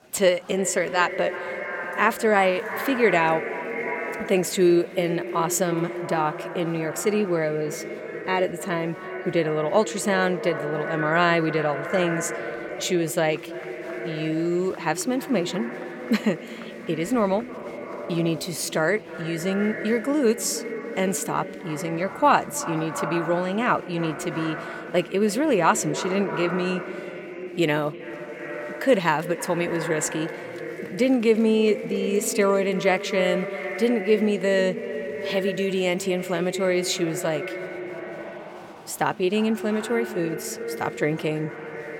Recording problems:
echo of what is said; strong; throughout; 320 ms later, 9 dB below the speech
murmuring crowd; faint; throughout; 25 dB below the speech

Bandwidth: 17 kHz